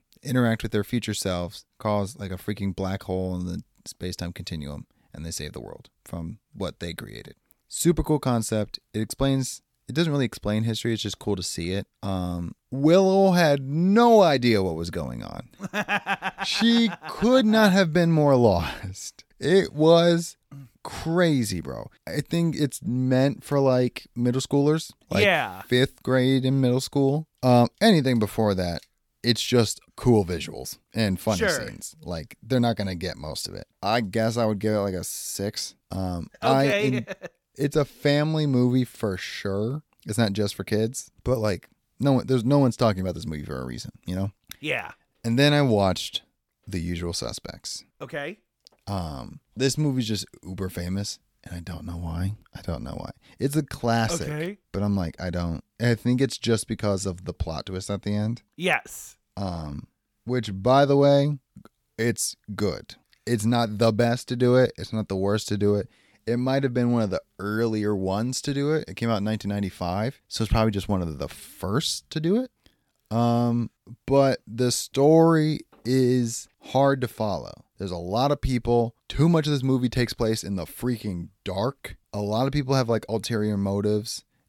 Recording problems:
none

